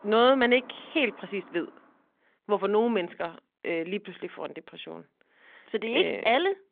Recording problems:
phone-call audio
traffic noise; faint; until 1.5 s; 25 dB below the speech

